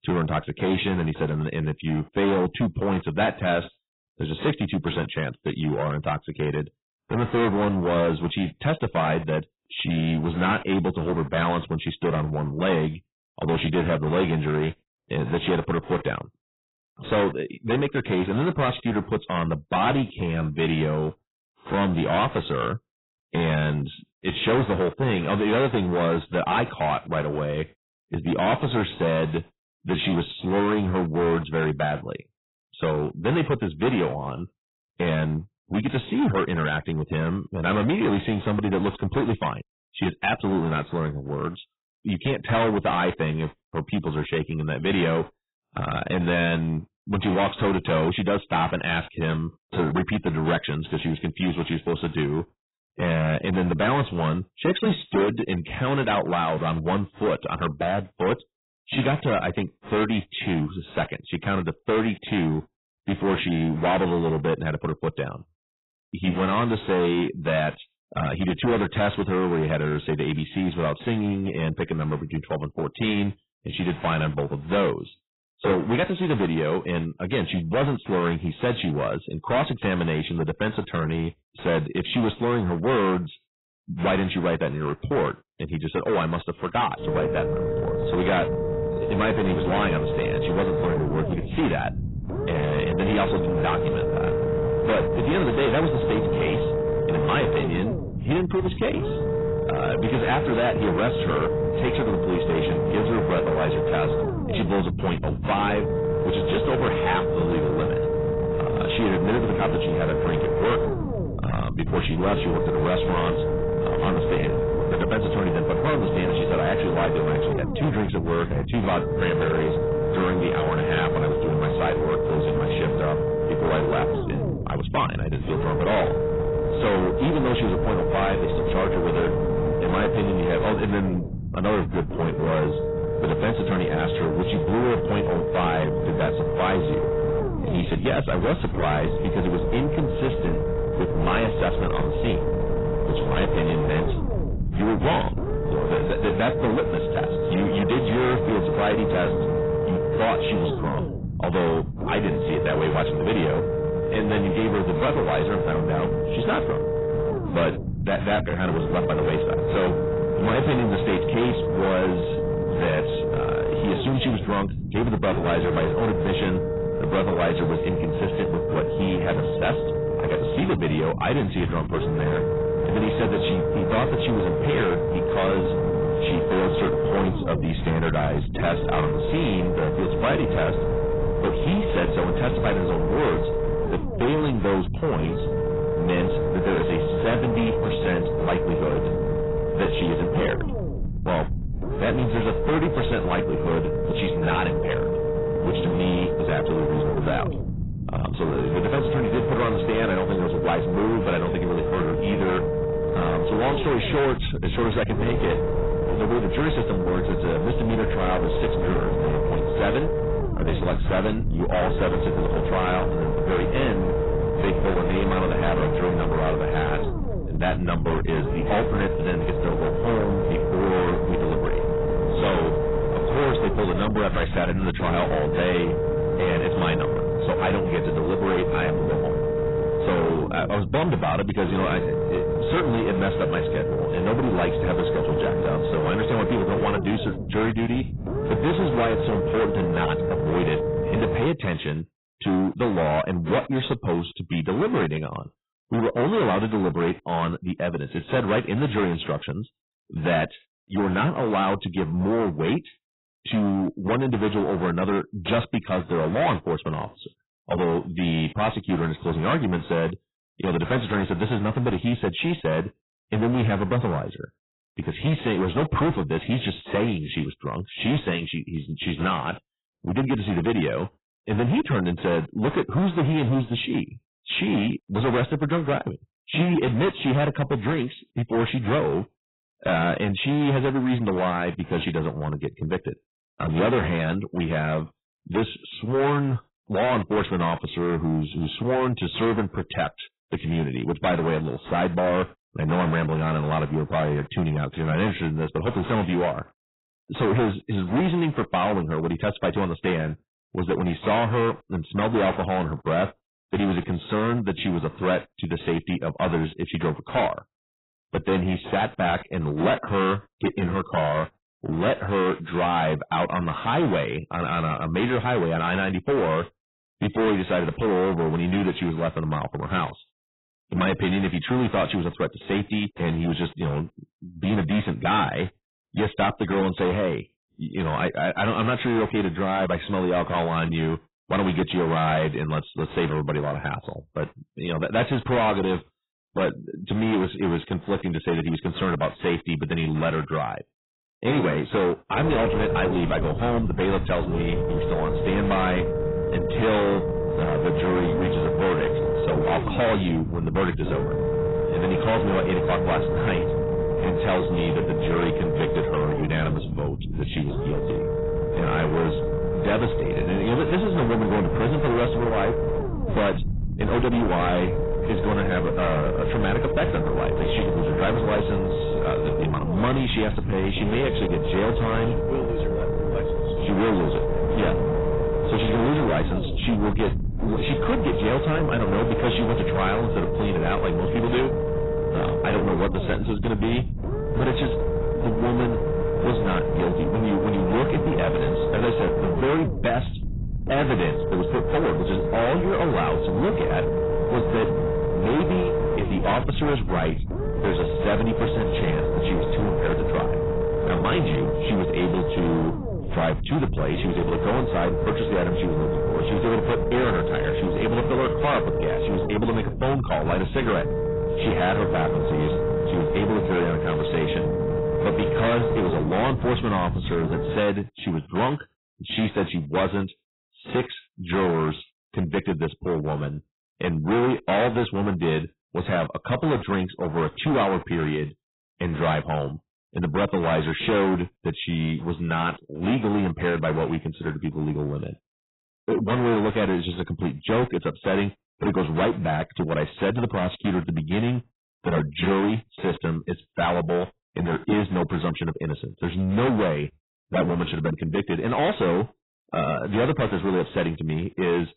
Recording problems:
distortion; heavy; 18% of the sound clipped
garbled, watery; badly; nothing above 4 kHz
low rumble; loud; from 1:27 to 4:01 and from 5:42 to 6:58; 1 dB below the speech

